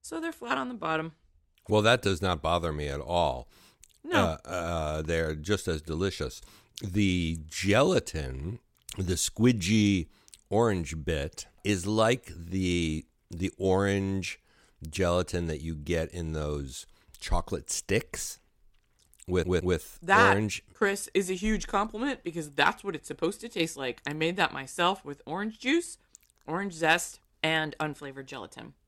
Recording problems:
audio stuttering; at 19 s

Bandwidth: 16.5 kHz